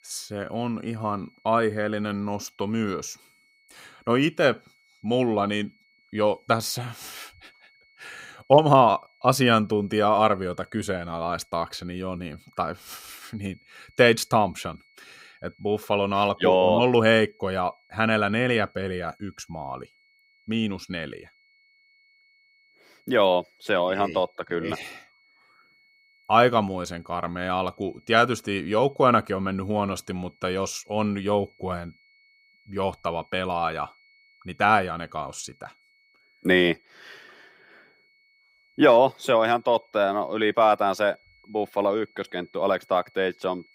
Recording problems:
high-pitched whine; faint; throughout; 2 kHz, 35 dB below the speech

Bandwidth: 15.5 kHz